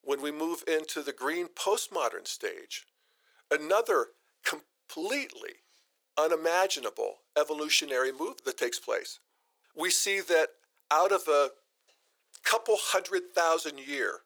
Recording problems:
thin; very; fading below 450 Hz

